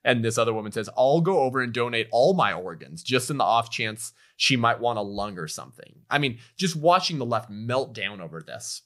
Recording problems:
none

